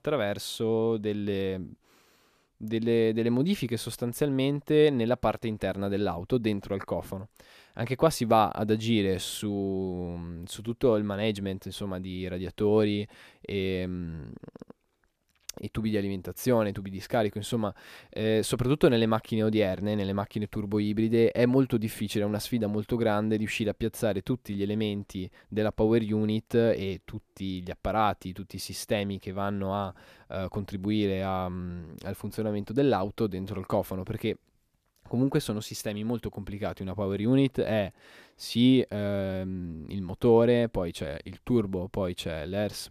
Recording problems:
none

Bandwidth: 14.5 kHz